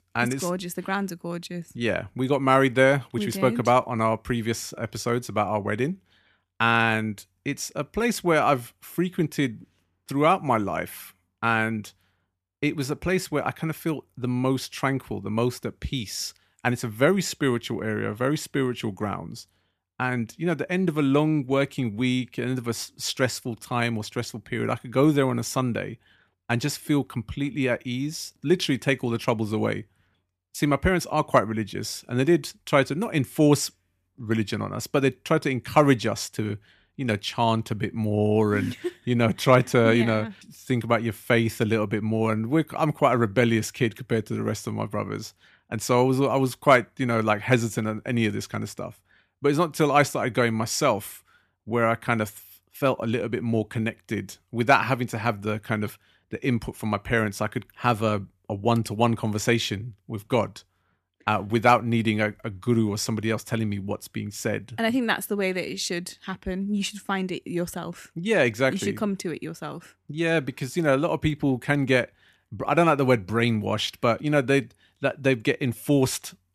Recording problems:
none

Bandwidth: 14.5 kHz